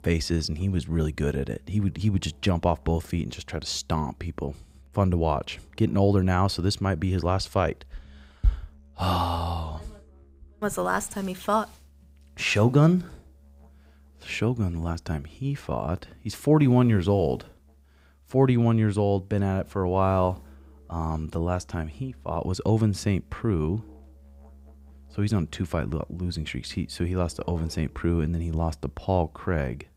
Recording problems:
background music; faint; throughout; 25 dB below the speech

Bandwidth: 15.5 kHz